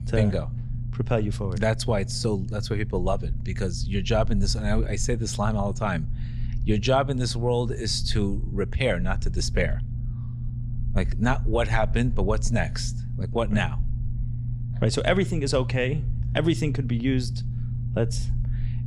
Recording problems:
low rumble; noticeable; throughout; 15 dB below the speech

